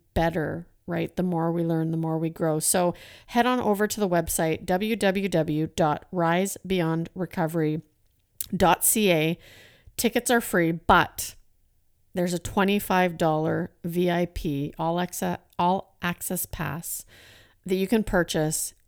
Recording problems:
none

